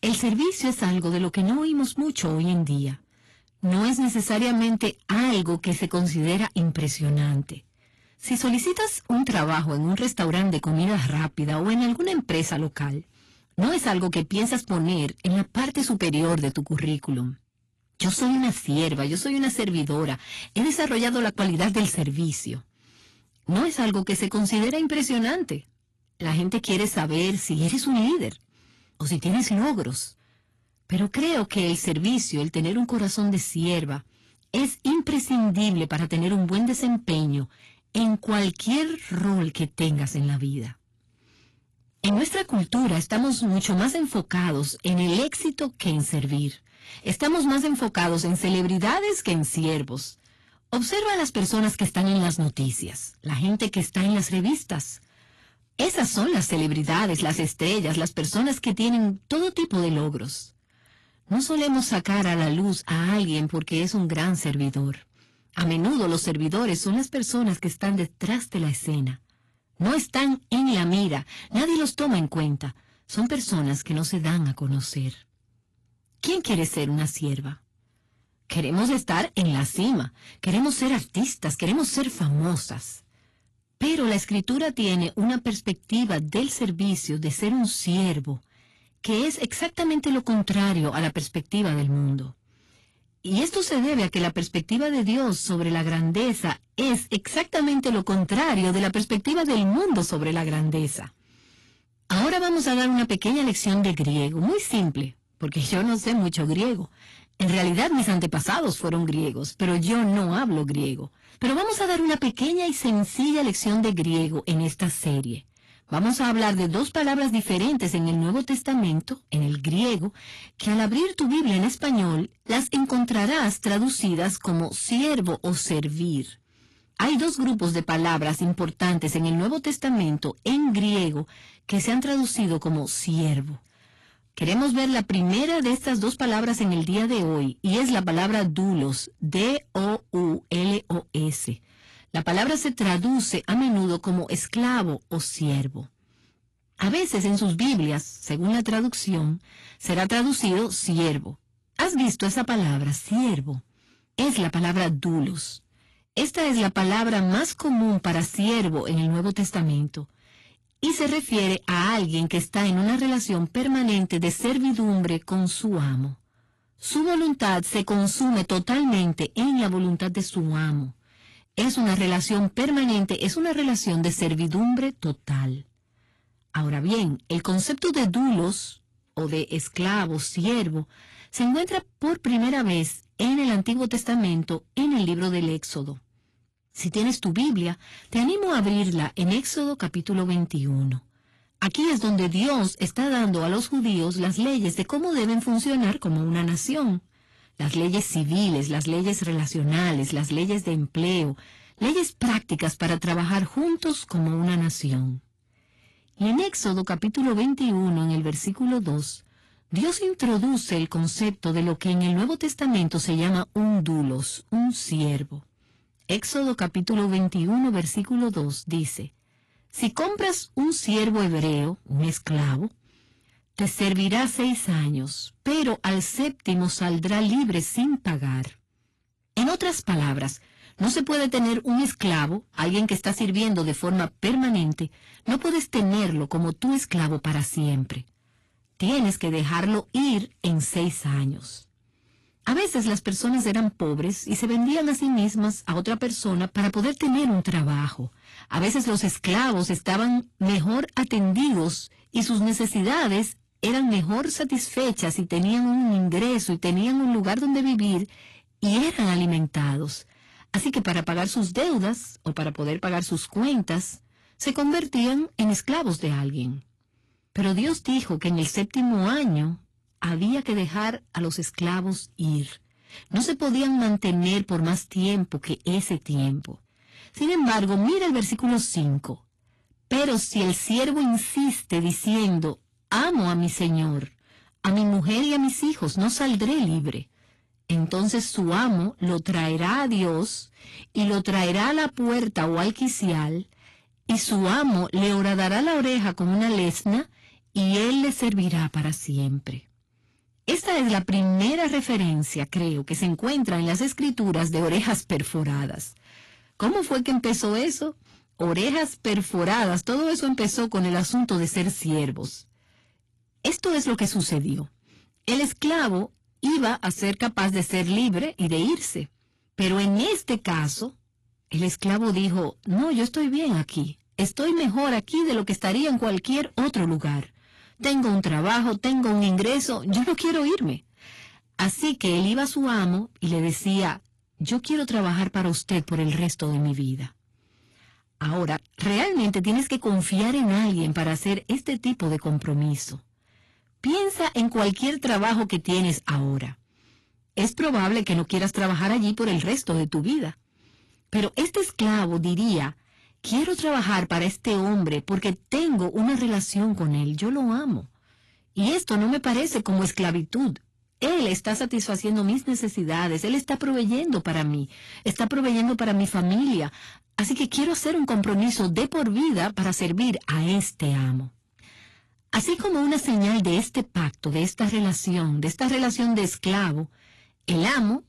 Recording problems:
distortion; slight; 15% of the sound clipped
garbled, watery; slightly; nothing above 11.5 kHz

